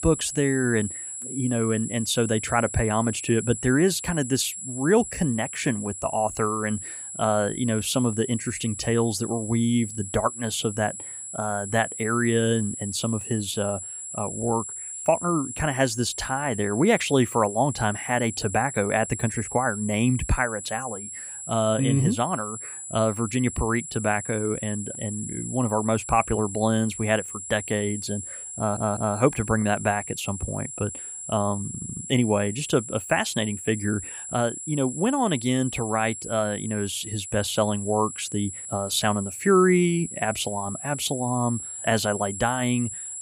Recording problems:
high-pitched whine; loud; throughout; 7.5 kHz, 8 dB below the speech
audio stuttering; at 29 s and at 32 s

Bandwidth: 15.5 kHz